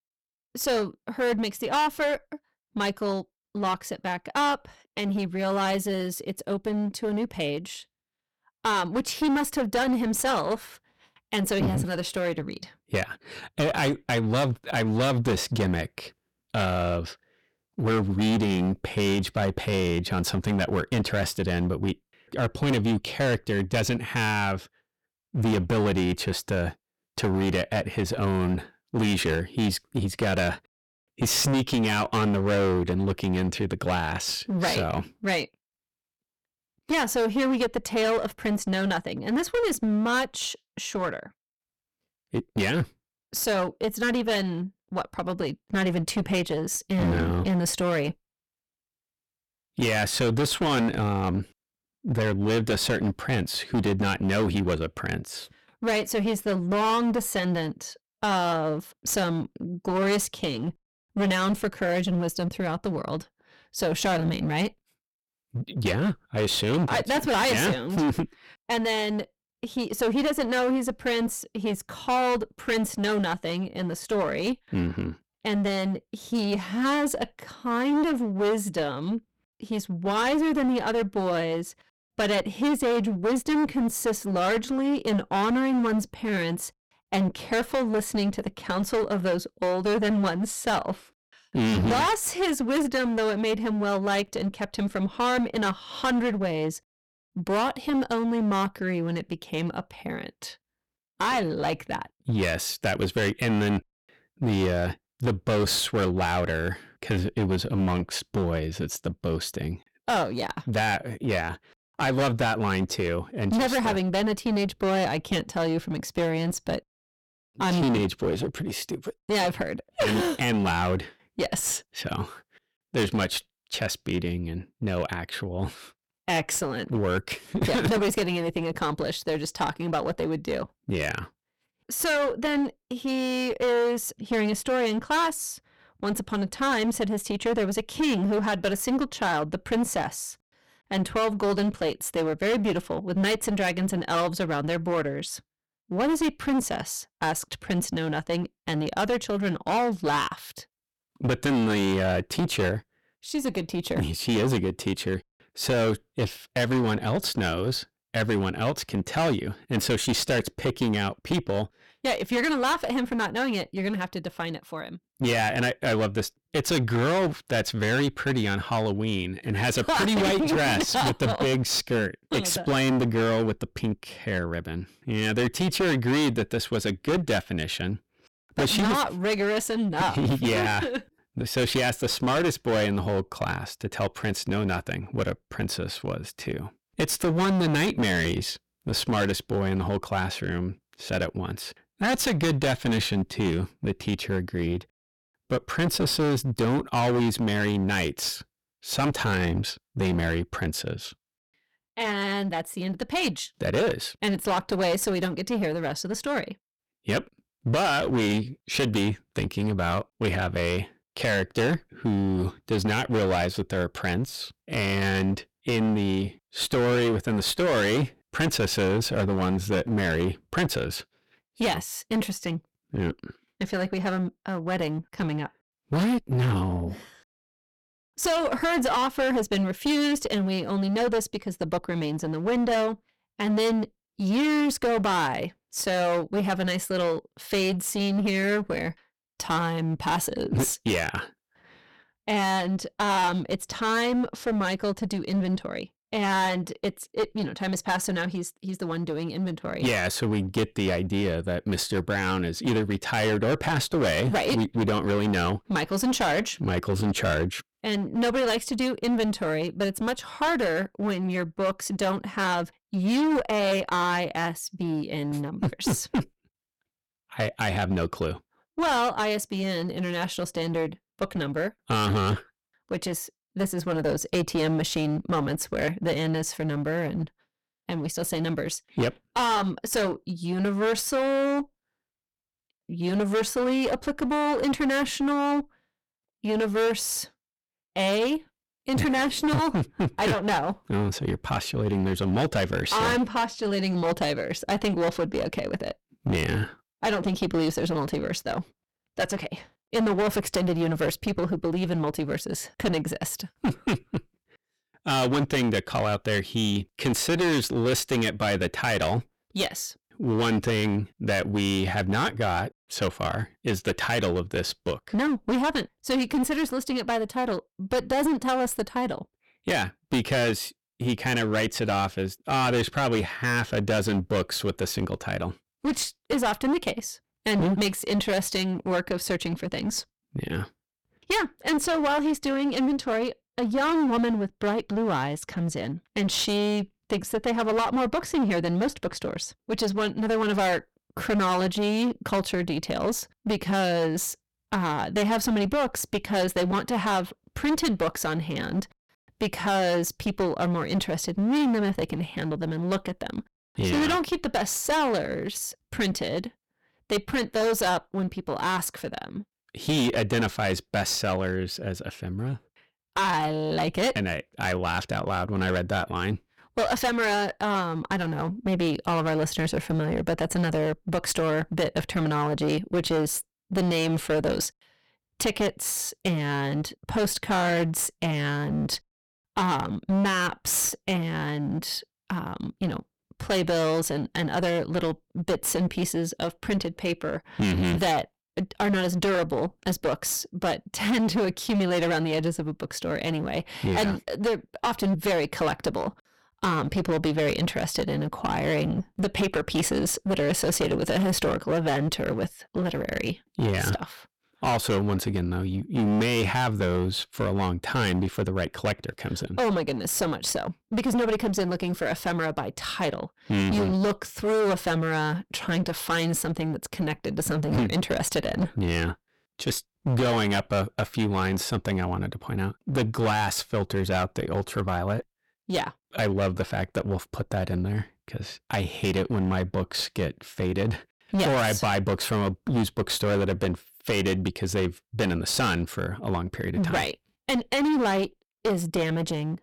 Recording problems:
distortion; heavy; 18% of the sound clipped

